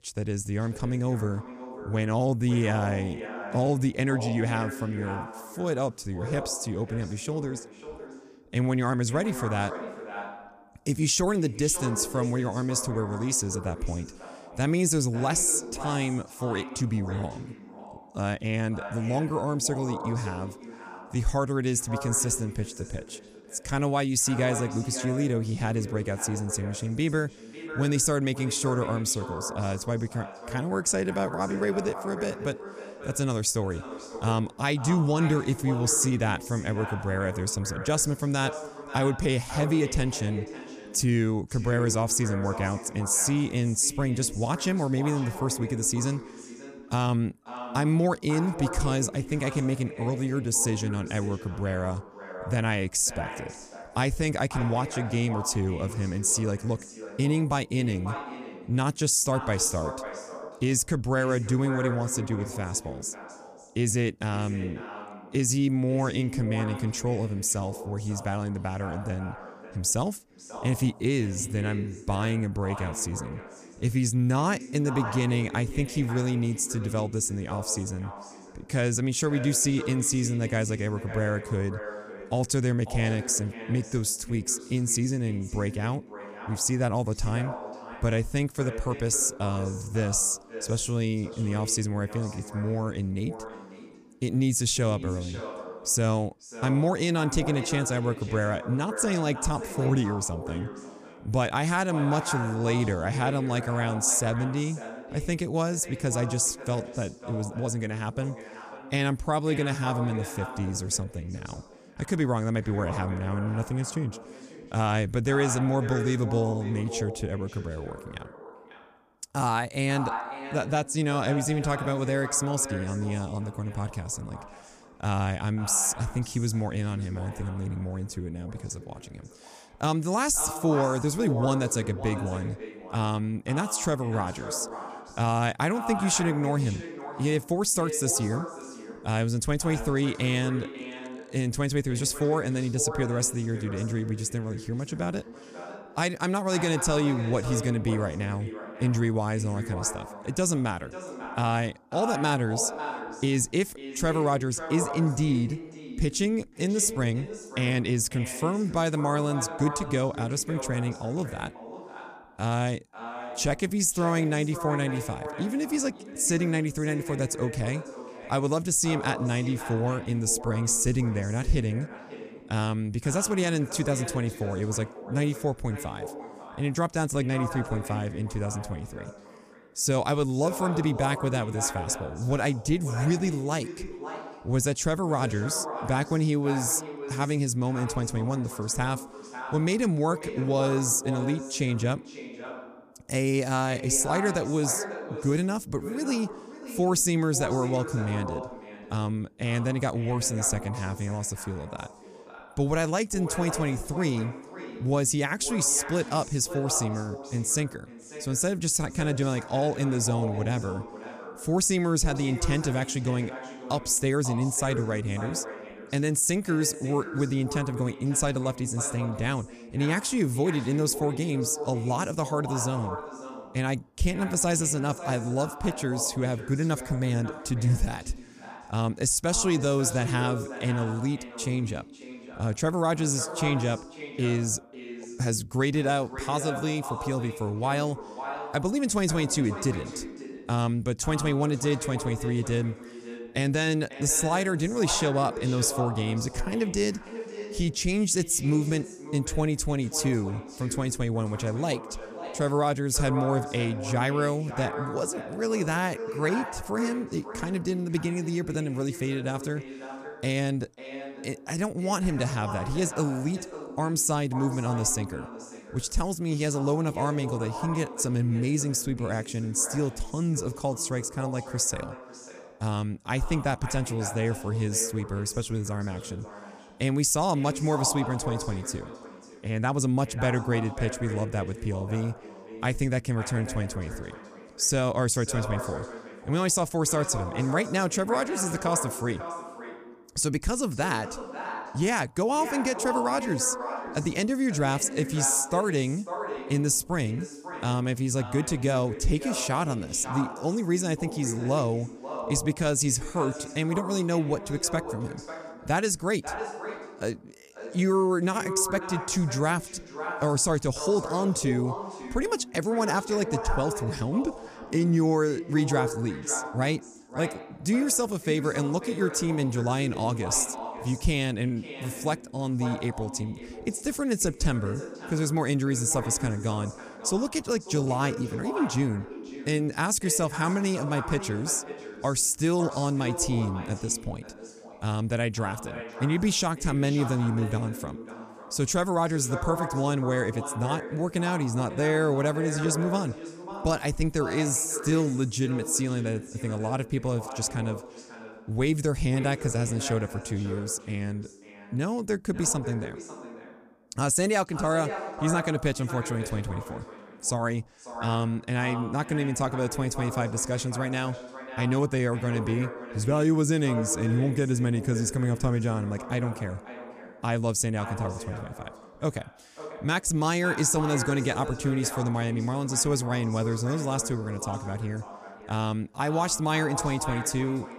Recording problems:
echo of what is said; strong; throughout; 540 ms later, 10 dB below the speech

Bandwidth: 14.5 kHz